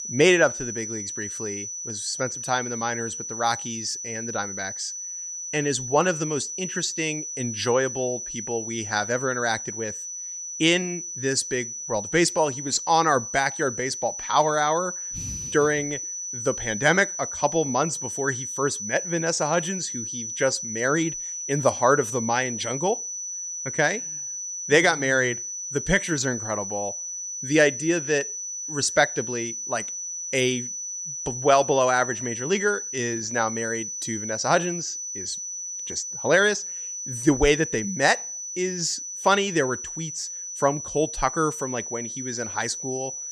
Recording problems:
high-pitched whine; loud; throughout; 6 kHz, 6 dB below the speech

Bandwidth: 15.5 kHz